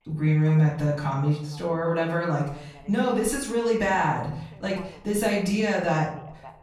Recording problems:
off-mic speech; far
room echo; noticeable; dies away in 0.6 s
voice in the background; faint; throughout; 25 dB below the speech

